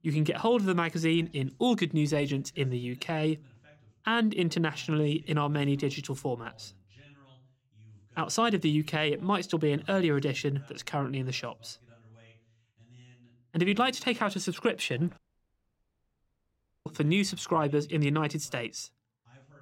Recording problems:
voice in the background; faint; throughout; 30 dB below the speech
audio cutting out; at 15 s for 1.5 s

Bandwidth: 16 kHz